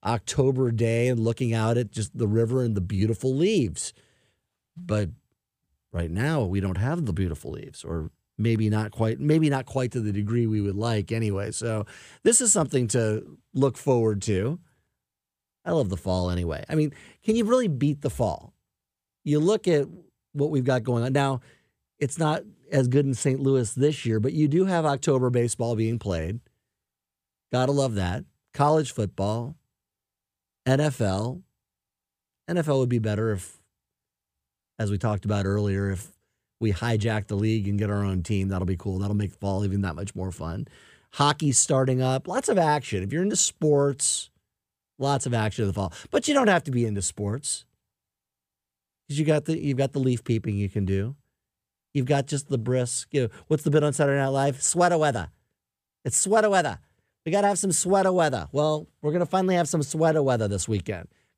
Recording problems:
none

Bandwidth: 15 kHz